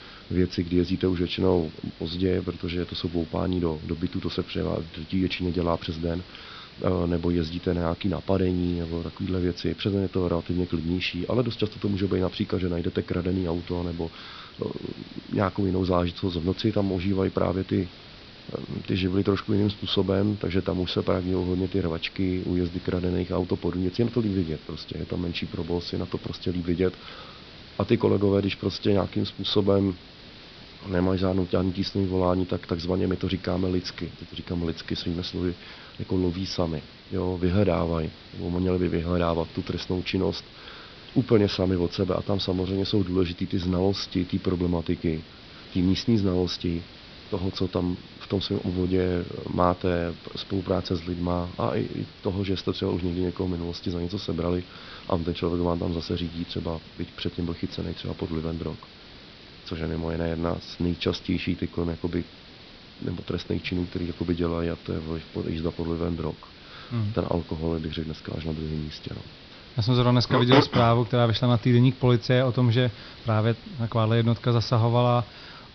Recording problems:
high frequencies cut off; noticeable; nothing above 5.5 kHz
hiss; noticeable; throughout; 20 dB below the speech

